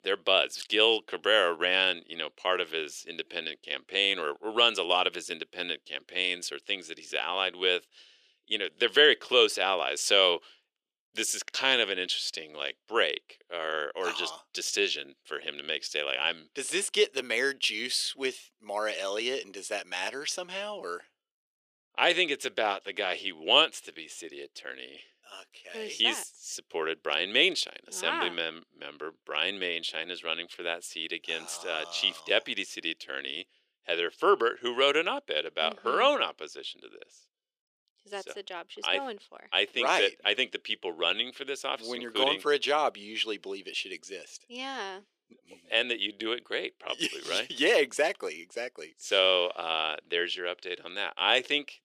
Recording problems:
thin; very; fading below 400 Hz

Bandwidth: 14.5 kHz